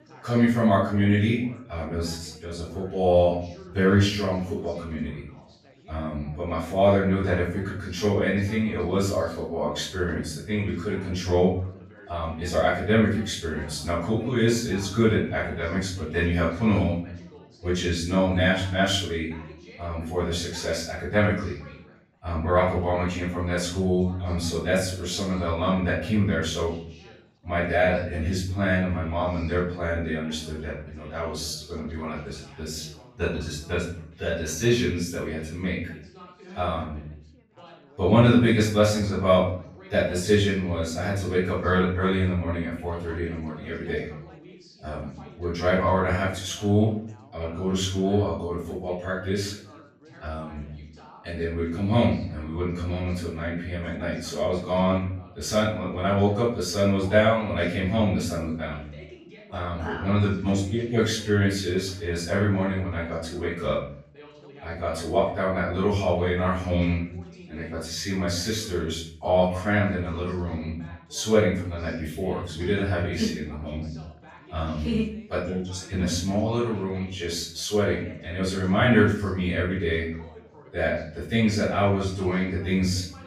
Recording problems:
off-mic speech; far
room echo; noticeable; dies away in 0.5 s
background chatter; faint; throughout; 4 voices, 25 dB below the speech

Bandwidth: 15.5 kHz